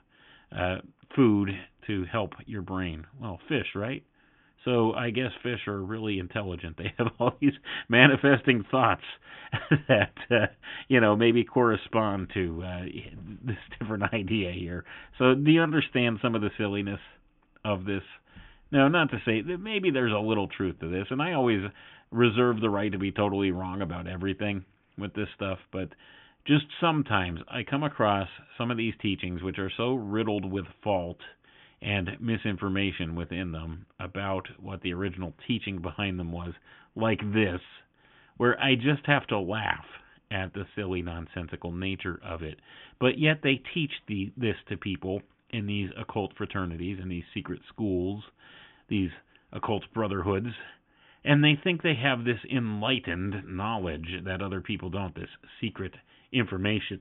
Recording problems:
high frequencies cut off; severe; nothing above 3.5 kHz

